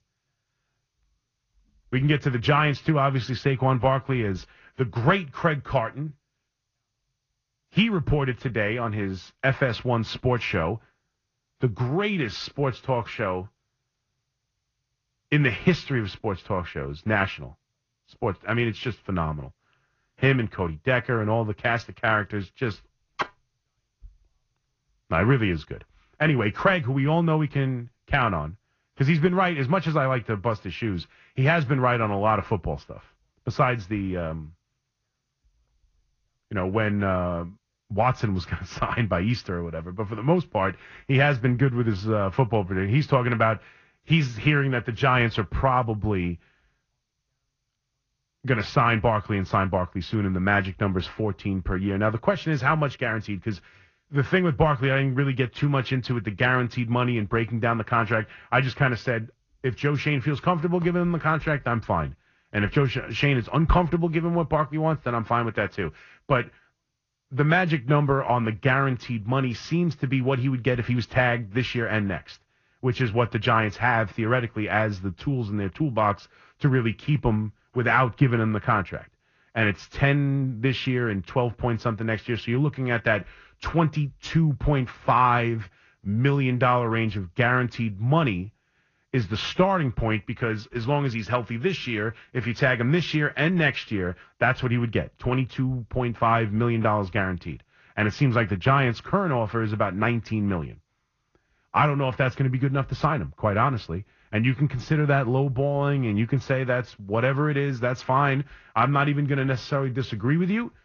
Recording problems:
garbled, watery; slightly; nothing above 6 kHz
muffled; very slightly; fading above 3.5 kHz

